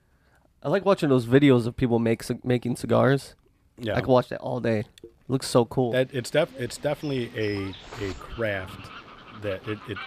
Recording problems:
animal sounds; noticeable; from 6 s on; 20 dB below the speech

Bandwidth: 14.5 kHz